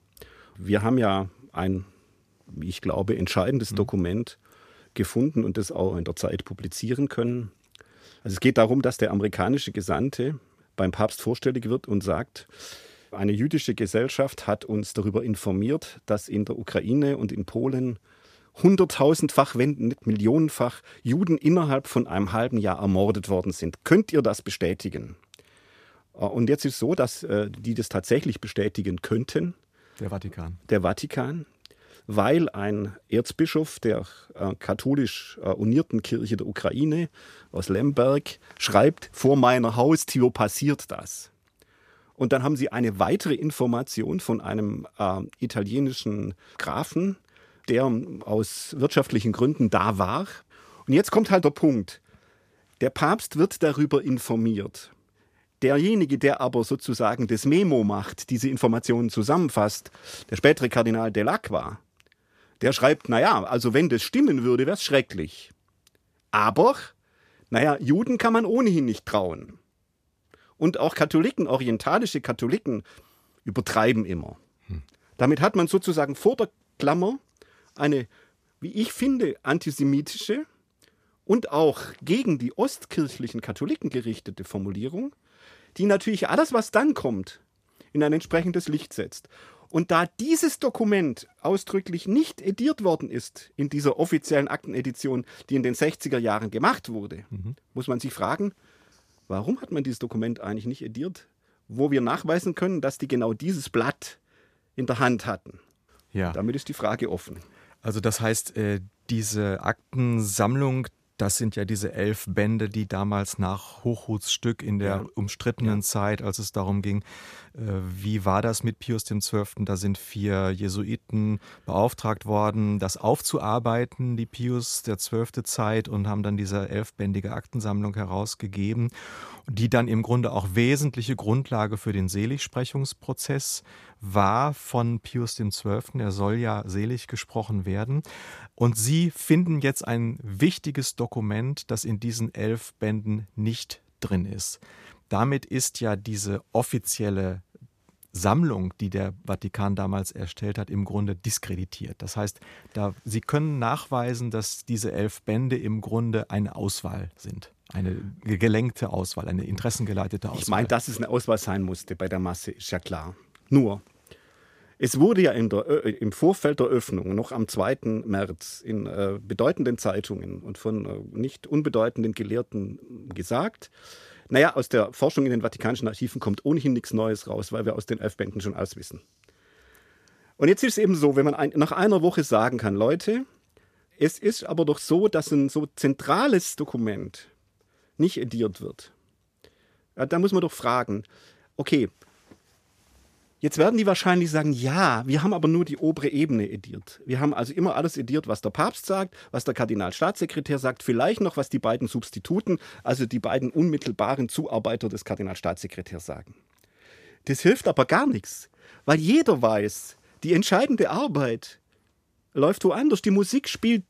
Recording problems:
none

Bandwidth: 15 kHz